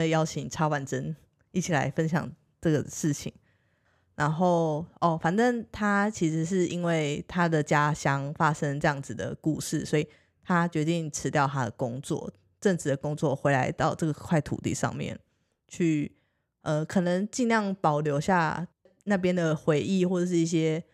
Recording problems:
abrupt cut into speech; at the start

